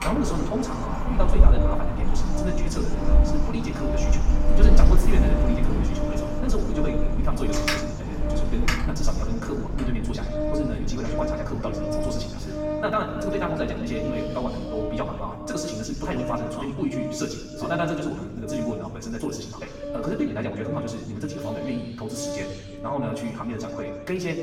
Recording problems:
off-mic speech; far
wrong speed, natural pitch; too fast; 1.7 times normal speed
room echo; noticeable; dies away in 1.3 s
wind in the background; very loud; throughout; 3 dB above the speech
background music; loud; throughout; 4 dB below the speech
electrical hum; noticeable; from 5.5 to 14 s; 50 Hz, 15 dB below the speech

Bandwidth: 16.5 kHz